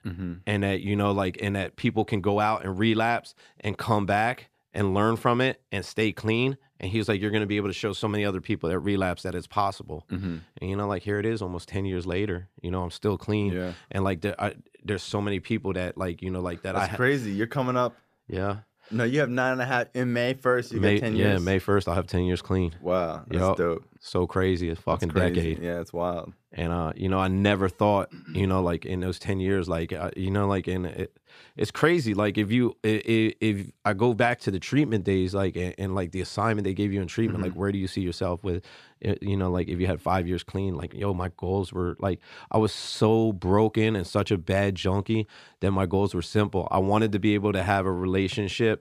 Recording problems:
none

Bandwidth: 14.5 kHz